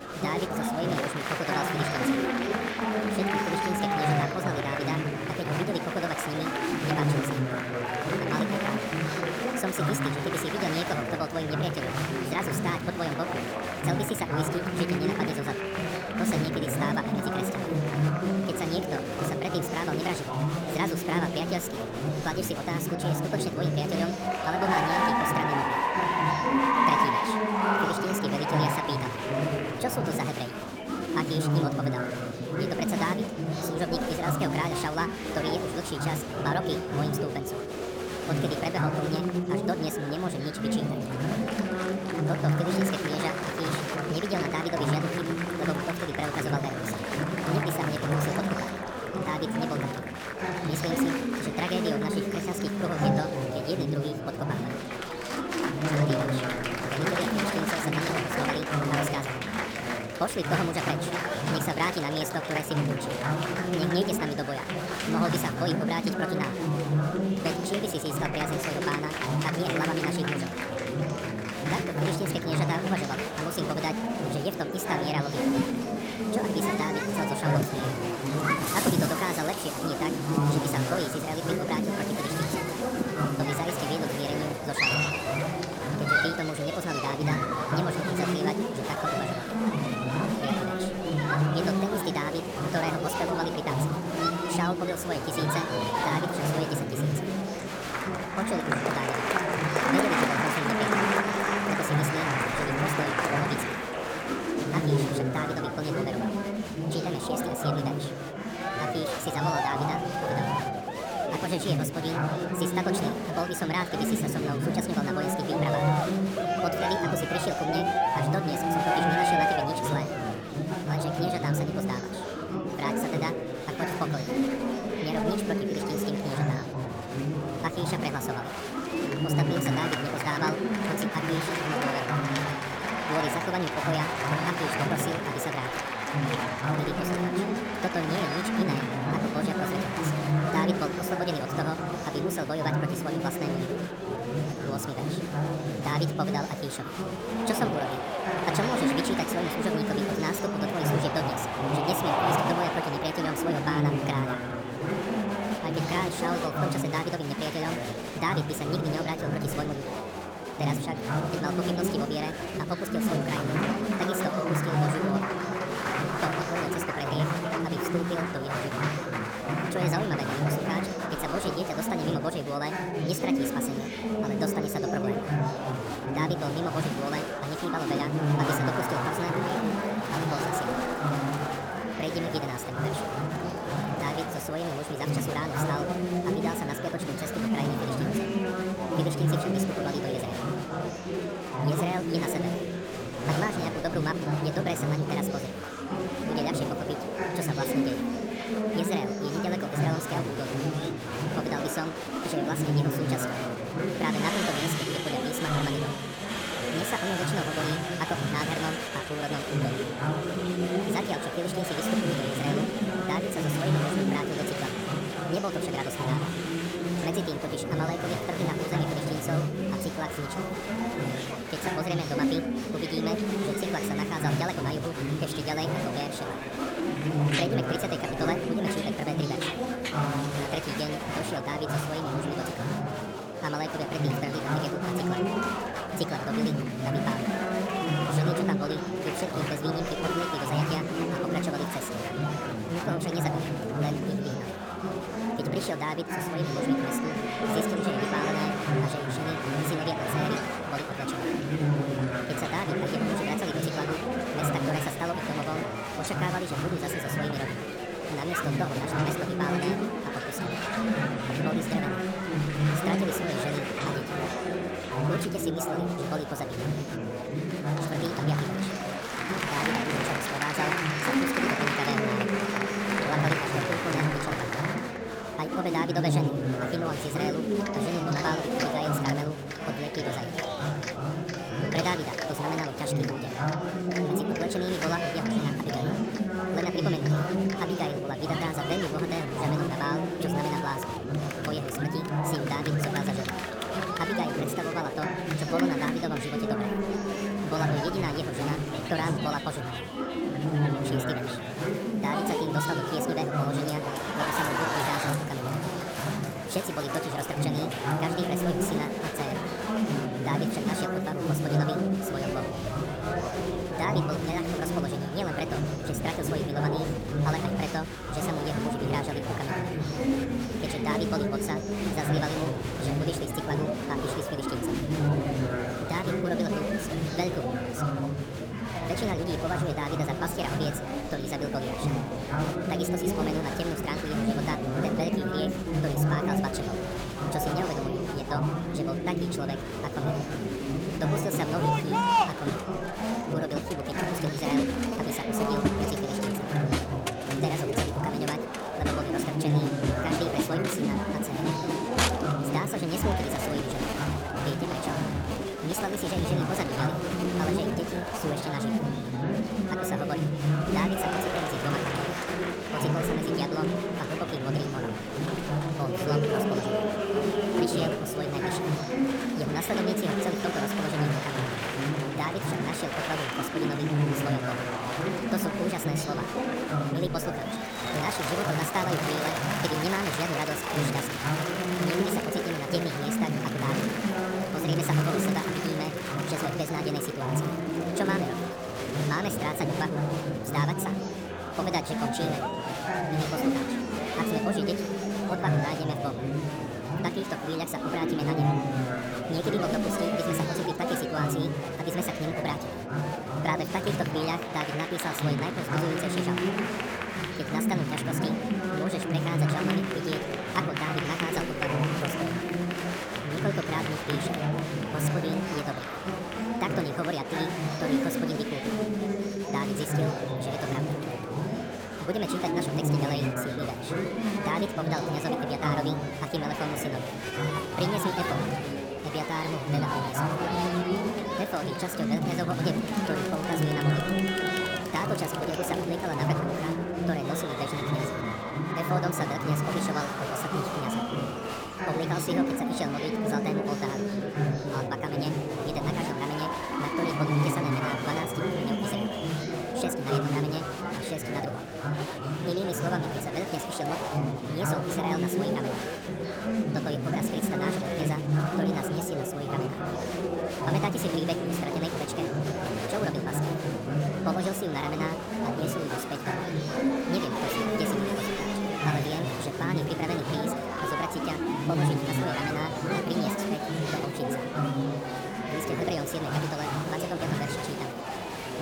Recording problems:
wrong speed and pitch; too fast and too high; 1.5 times normal speed
murmuring crowd; very loud; throughout; 4 dB above the speech

